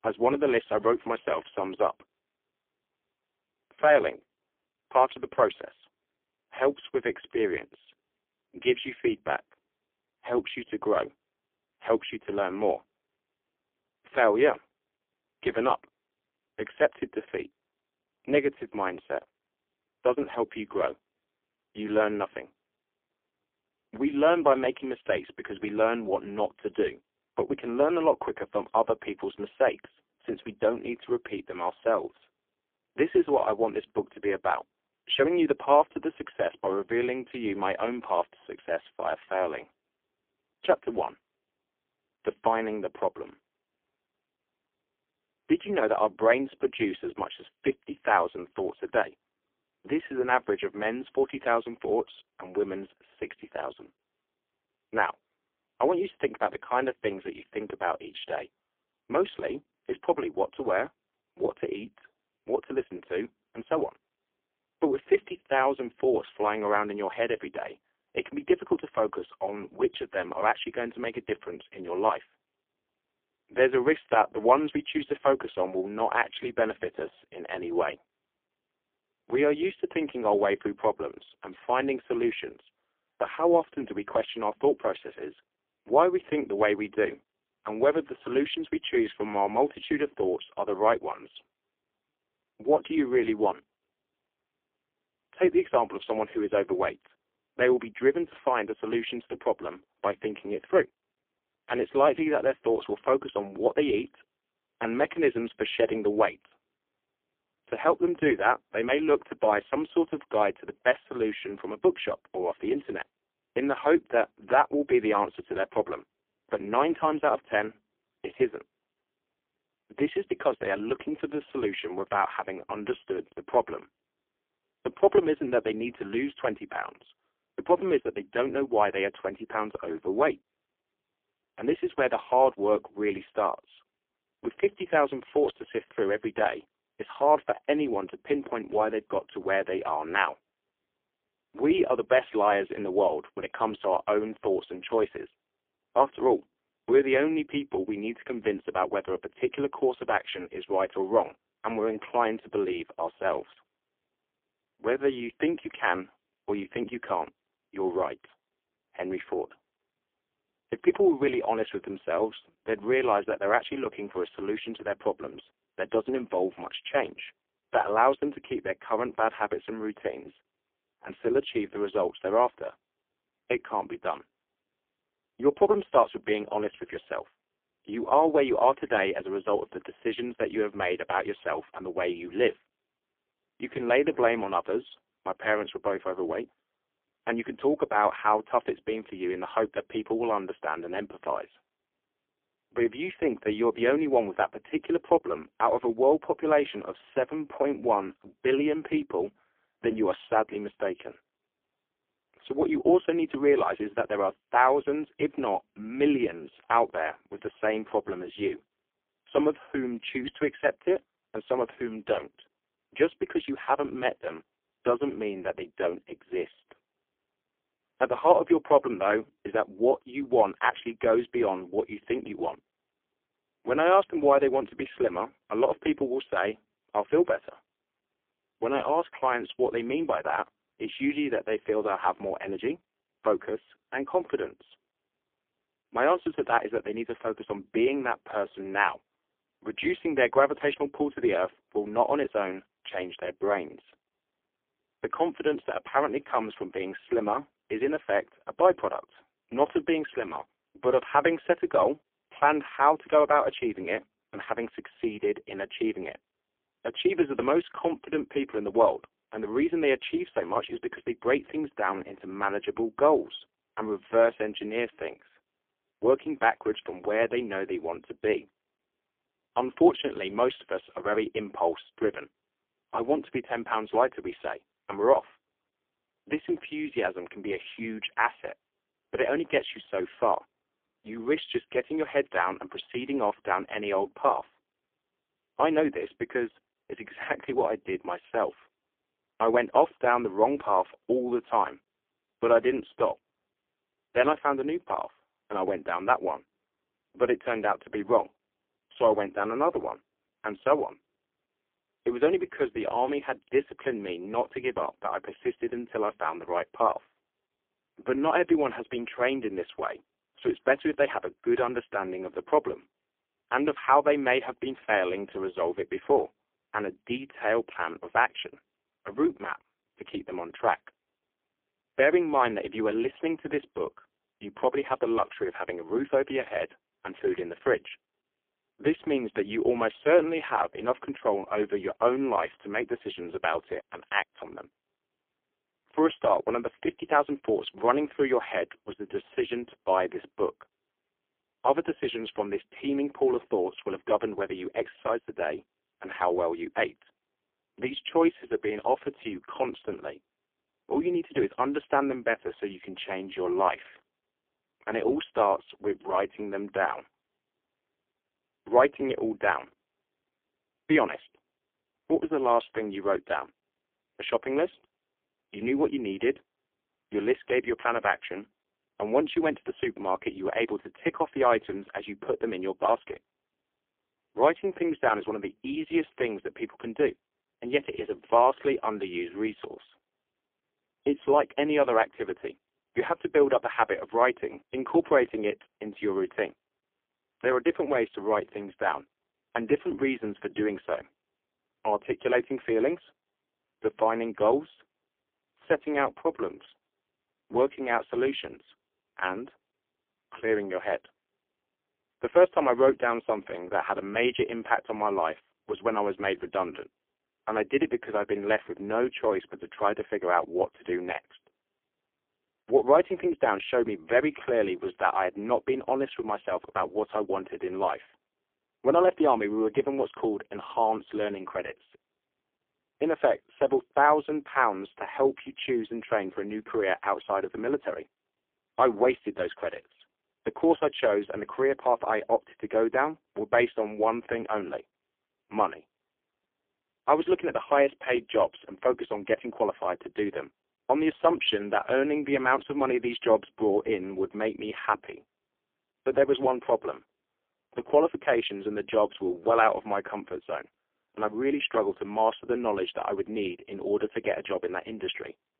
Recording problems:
phone-call audio; poor line; nothing above 3.5 kHz

